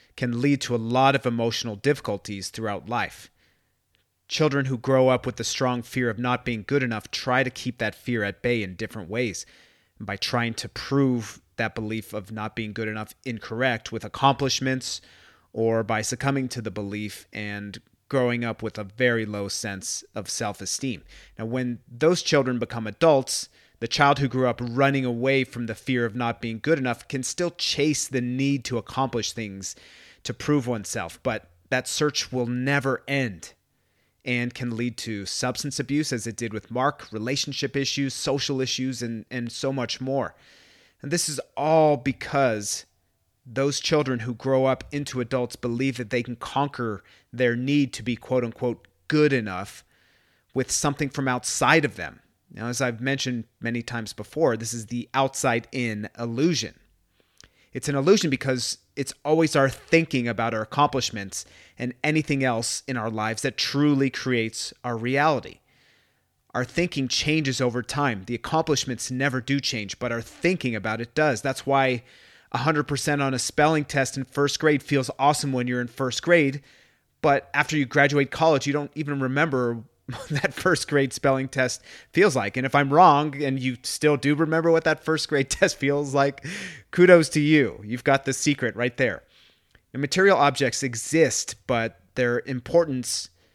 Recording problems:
none

